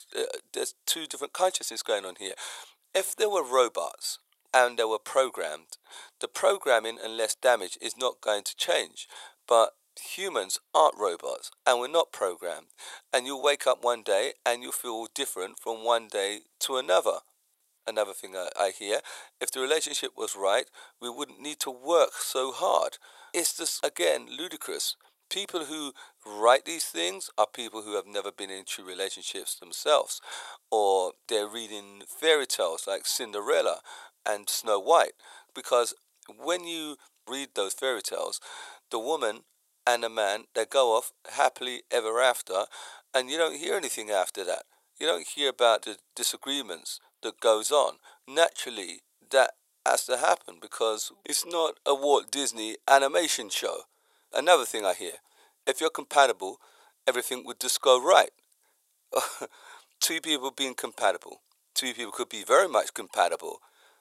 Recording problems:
thin; very; fading below 550 Hz

